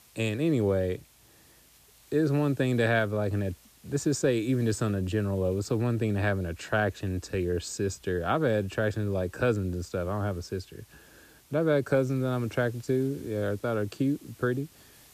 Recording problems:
hiss; faint; throughout; 25 dB below the speech

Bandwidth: 14.5 kHz